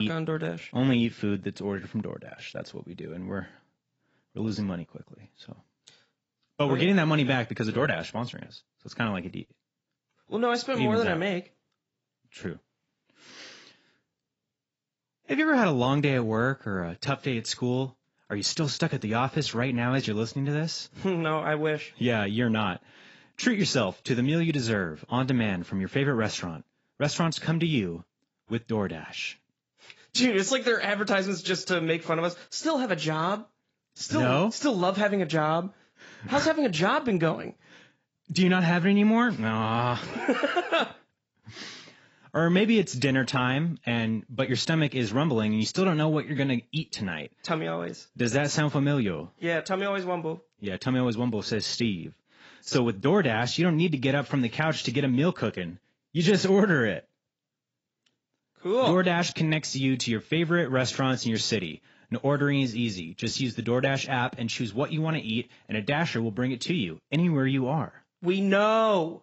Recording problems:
garbled, watery; badly; nothing above 7.5 kHz
abrupt cut into speech; at the start

